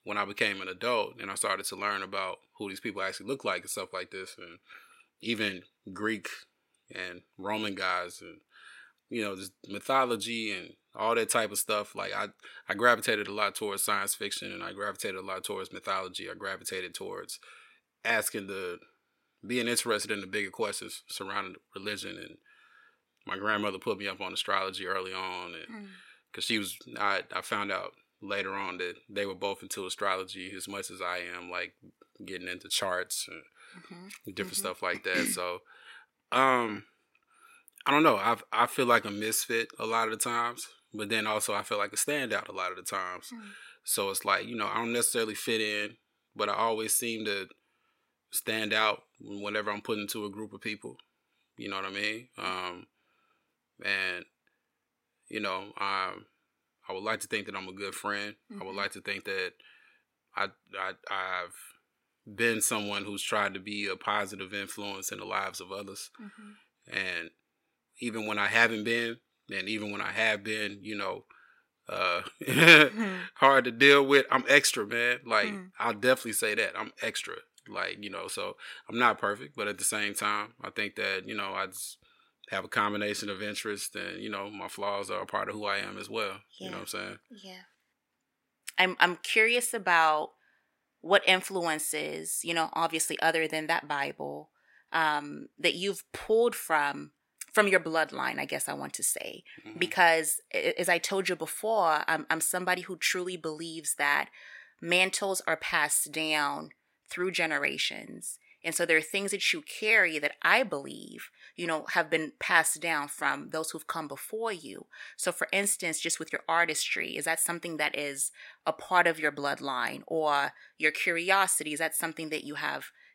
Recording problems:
thin; somewhat; fading below 600 Hz

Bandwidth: 16 kHz